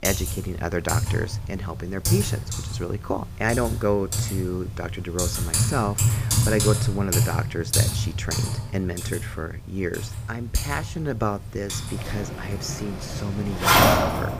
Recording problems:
household noises; very loud; throughout; 4 dB above the speech

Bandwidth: 15 kHz